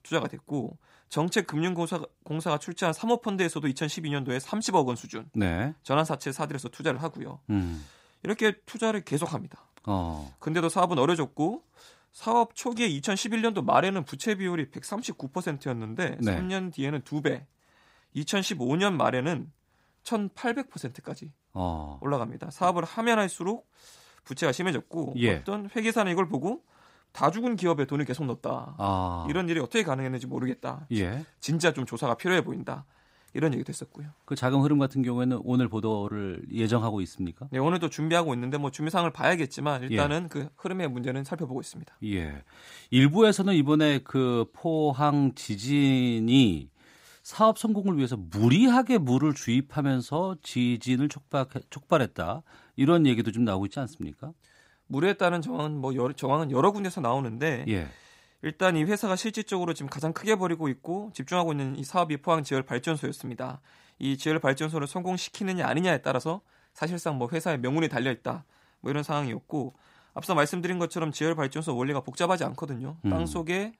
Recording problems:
none

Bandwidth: 15.5 kHz